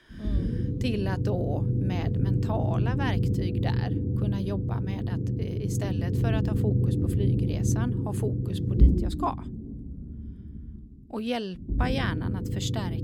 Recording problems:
low rumble; loud; throughout; 2 dB below the speech

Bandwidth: 18.5 kHz